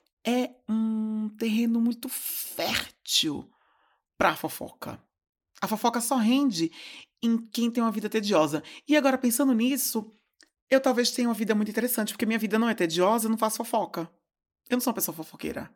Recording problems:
none

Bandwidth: 18 kHz